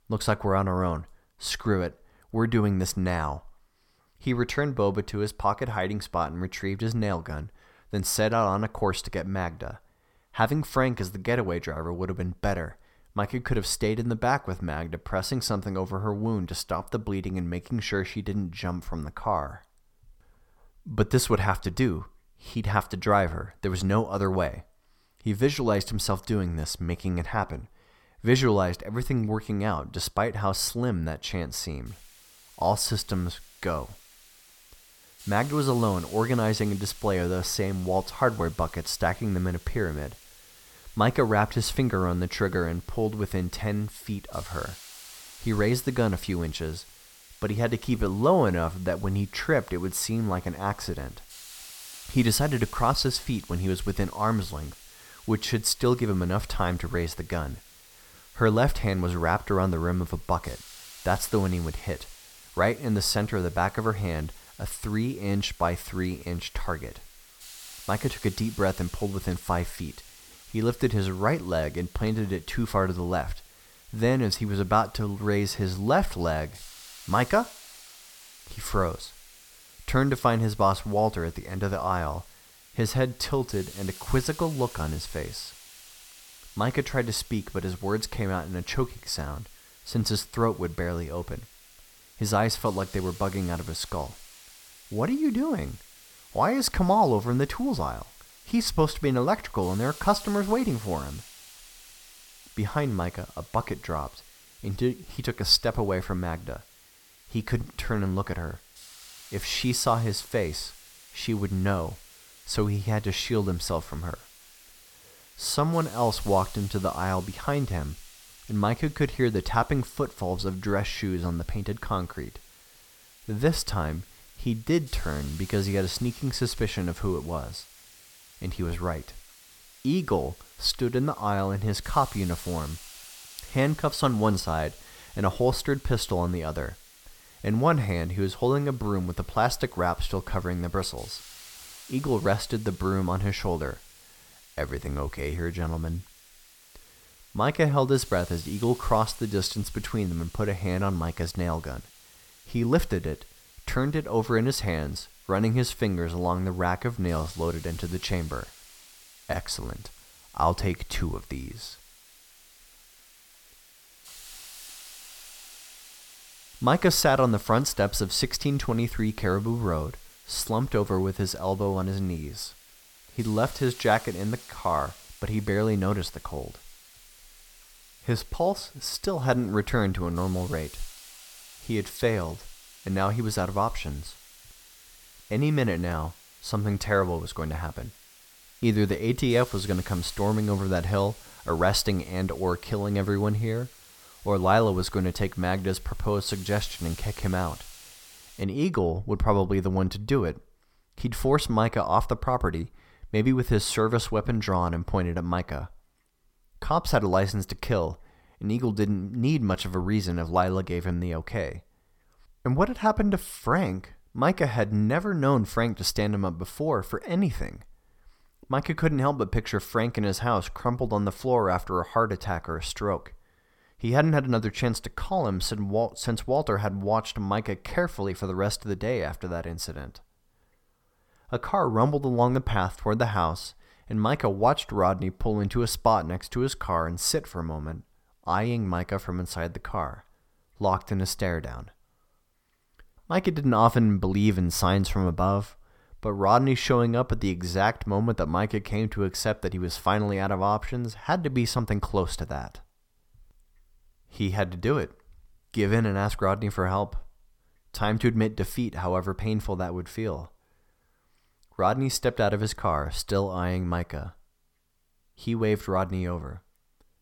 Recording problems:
hiss; noticeable; from 32 s to 3:18; 20 dB below the speech

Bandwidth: 17.5 kHz